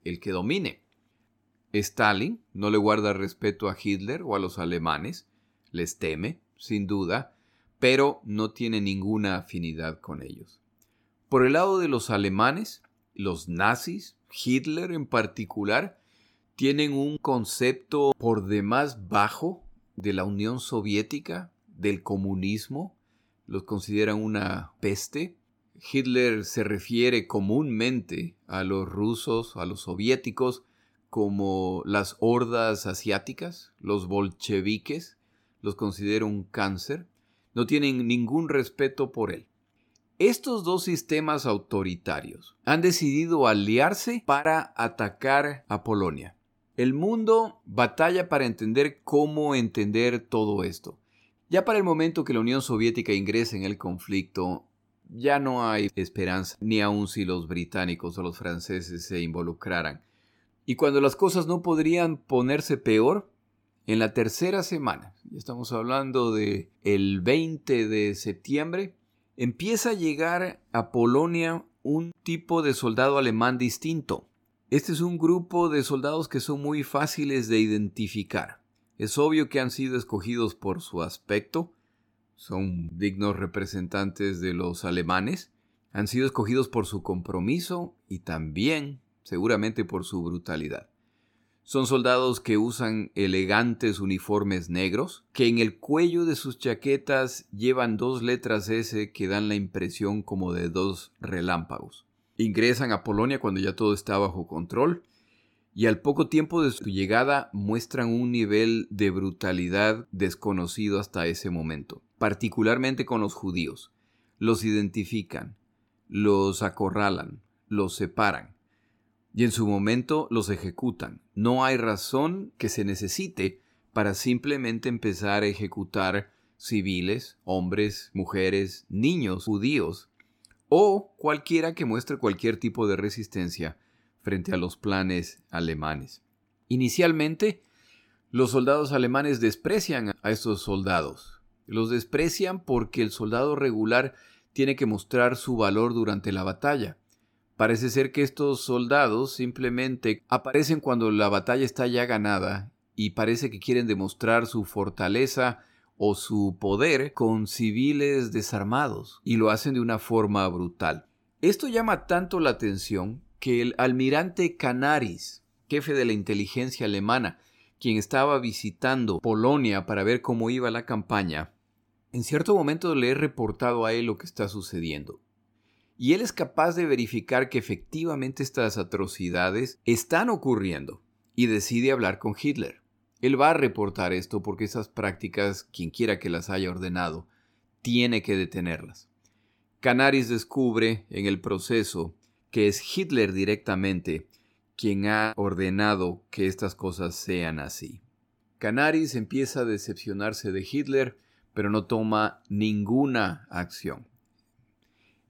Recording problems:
none

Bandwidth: 17 kHz